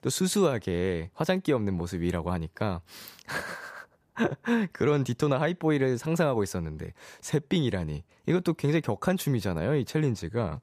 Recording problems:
none

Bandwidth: 14.5 kHz